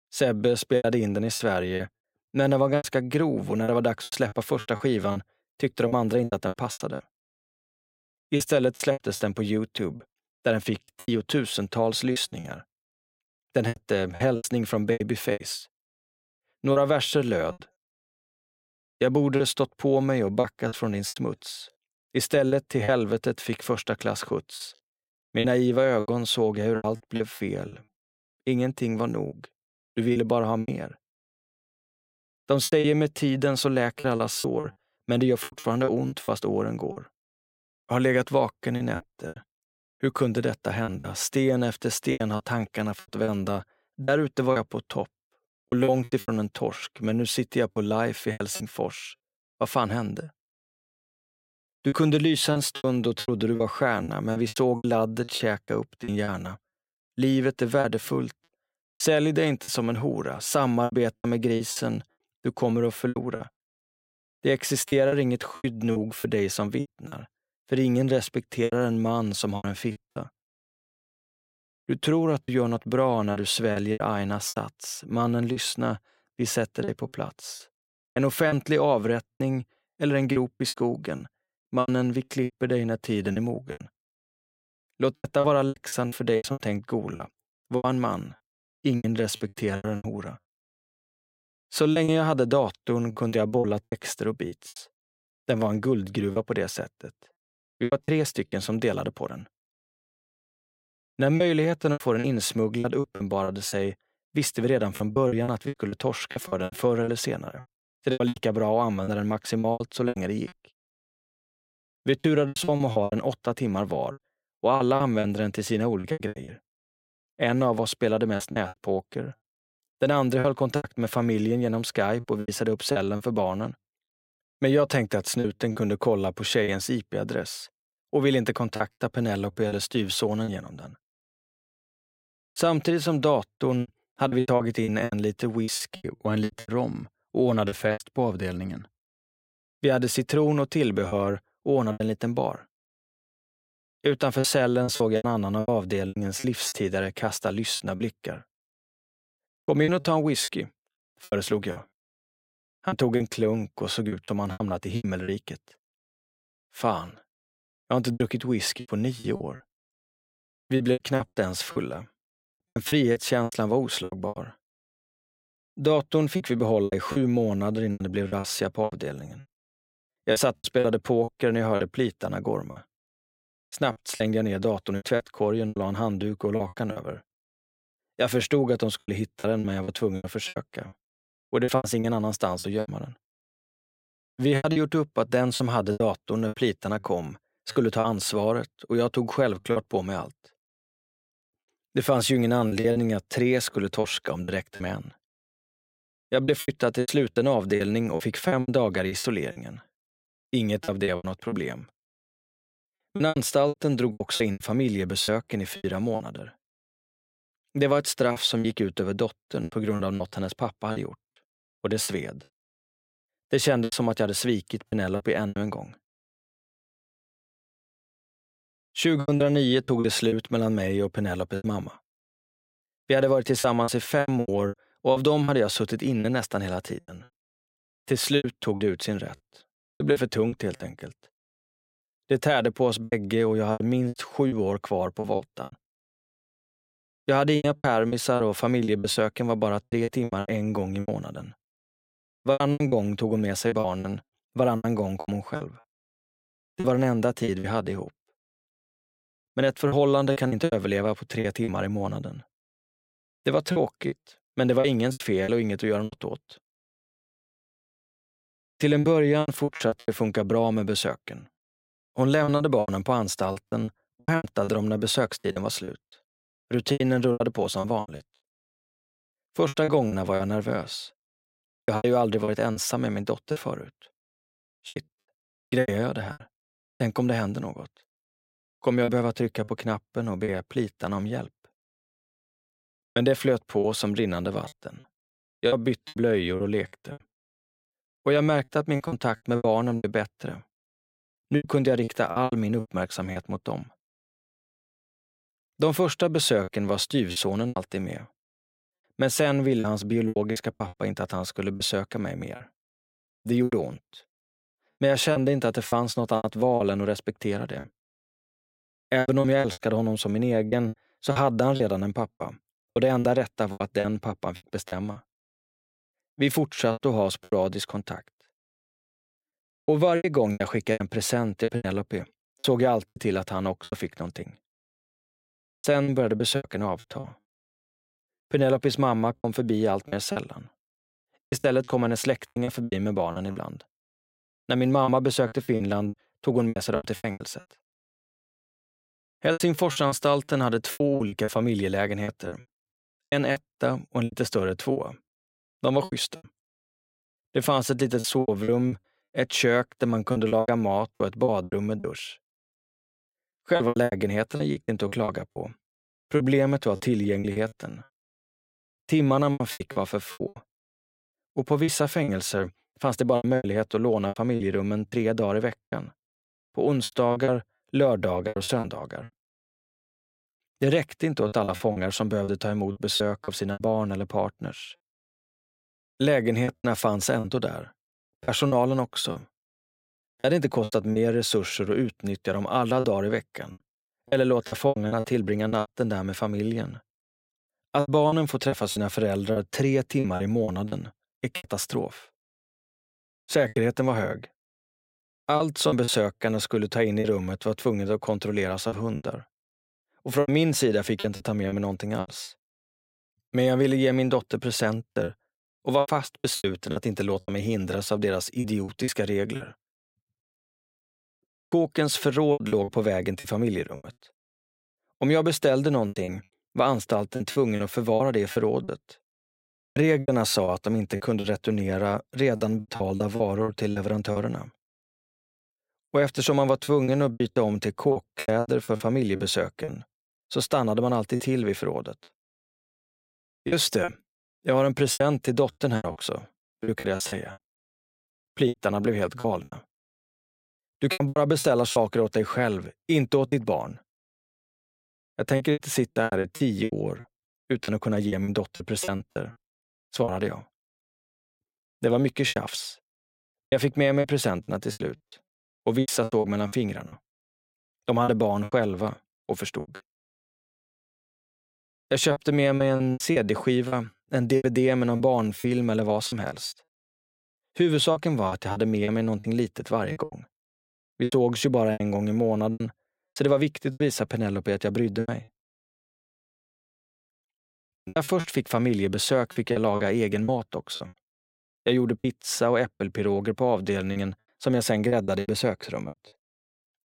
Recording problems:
choppy; very; 12% of the speech affected

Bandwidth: 16 kHz